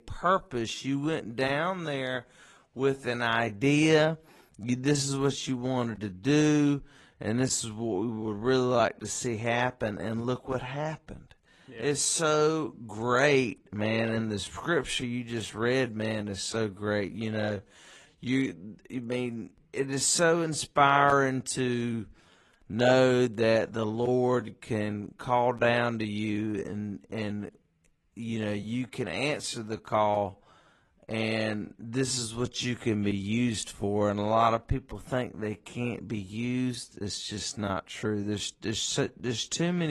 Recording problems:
wrong speed, natural pitch; too slow; 0.7 times normal speed
garbled, watery; slightly
abrupt cut into speech; at the end

